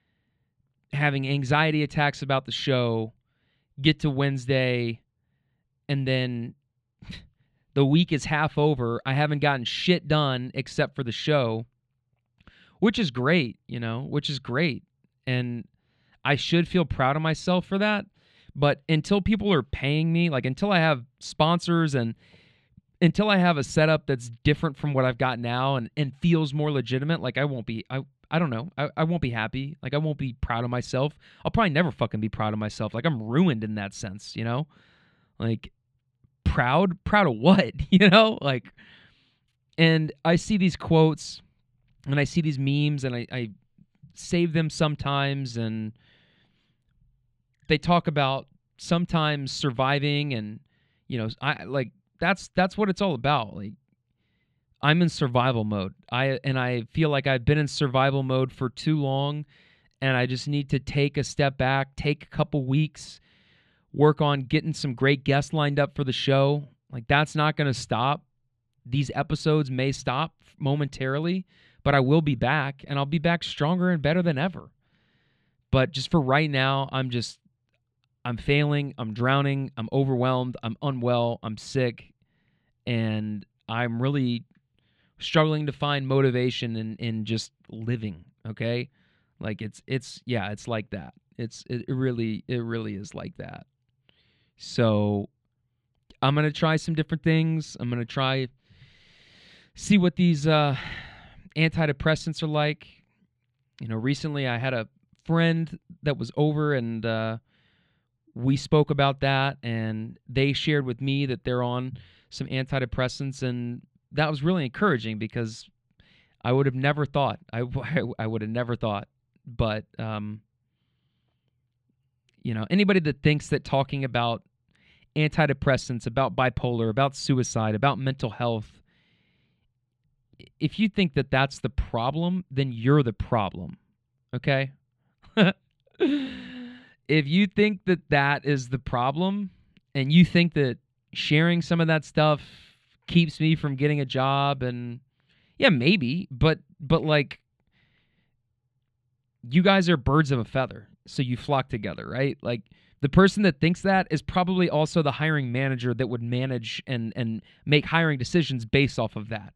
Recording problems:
muffled; very slightly; fading above 3 kHz

